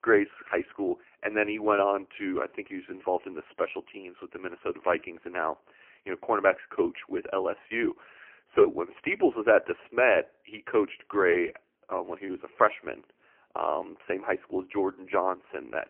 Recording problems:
phone-call audio; poor line

